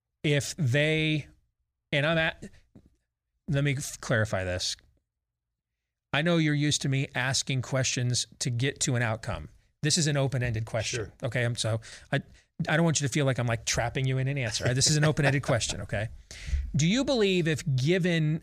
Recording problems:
none

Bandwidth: 15 kHz